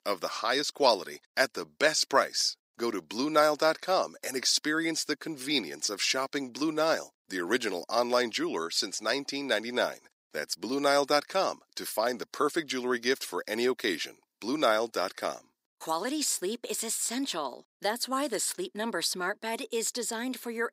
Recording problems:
thin; somewhat; fading below 300 Hz

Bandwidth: 15.5 kHz